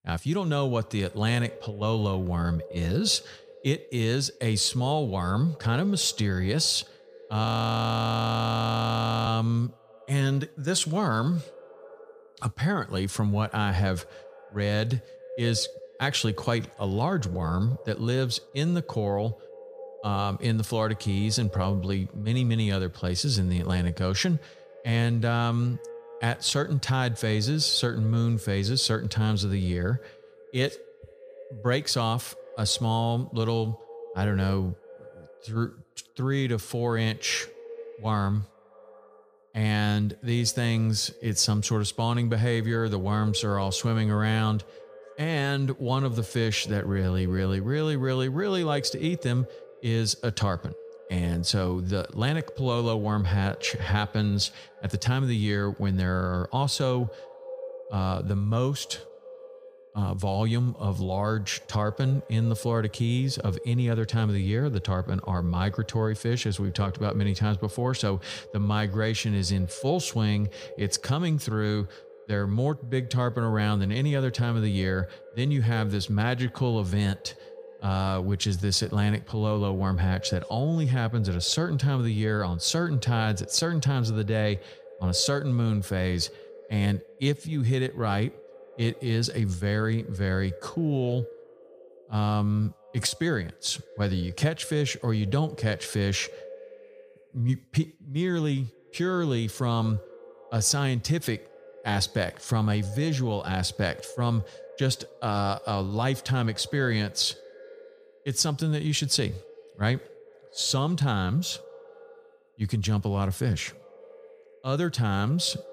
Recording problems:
echo of what is said; faint; throughout; 200 ms later, 20 dB below the speech
audio freezing; at 7.5 s for 2 s

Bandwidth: 14.5 kHz